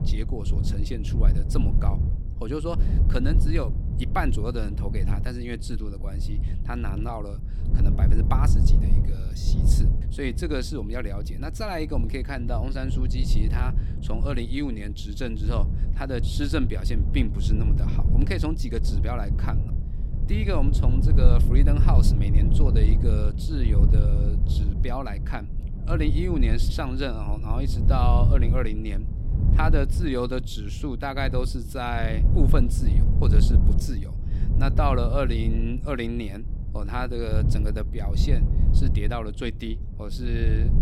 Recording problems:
low rumble; loud; throughout; 7 dB below the speech

